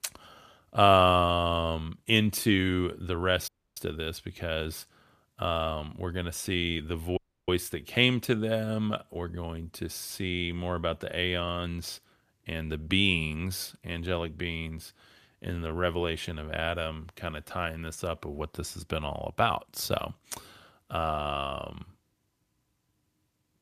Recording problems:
audio cutting out; at 3.5 s and at 7 s

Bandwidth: 14.5 kHz